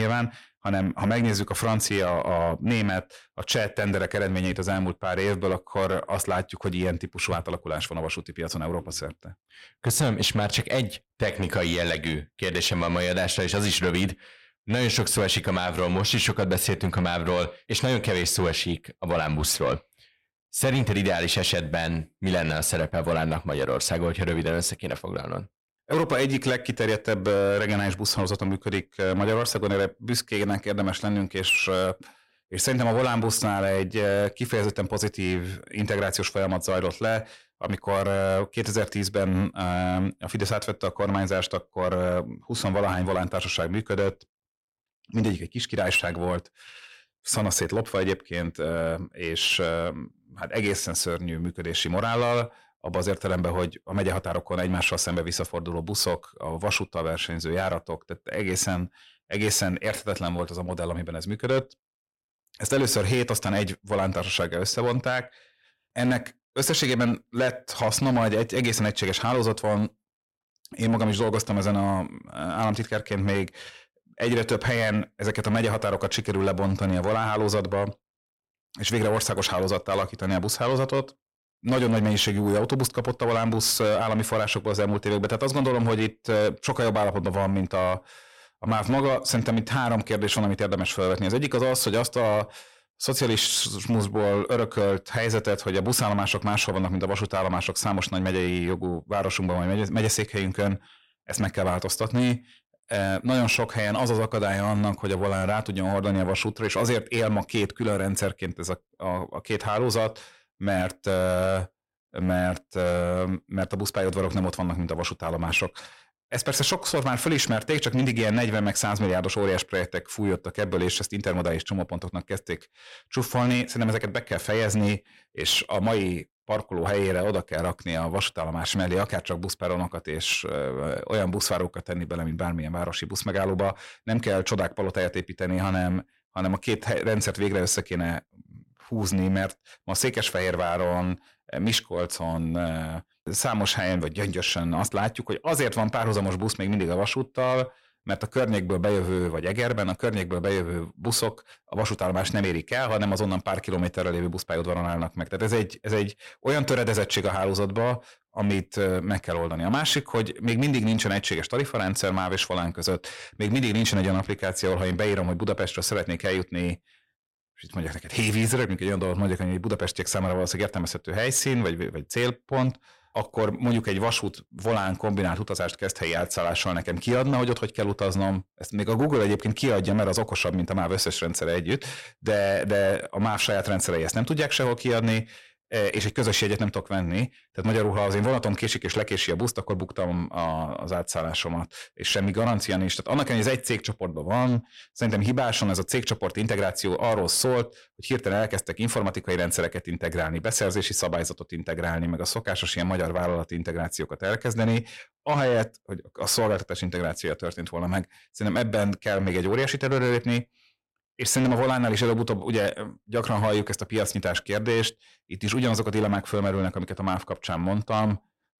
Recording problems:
distortion; slight; 10 dB below the speech
abrupt cut into speech; at the start

